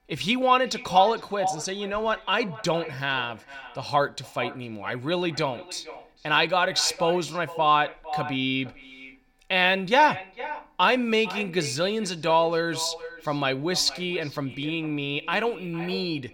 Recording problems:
echo of what is said; noticeable; throughout; 450 ms later, 15 dB below the speech

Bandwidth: 17.5 kHz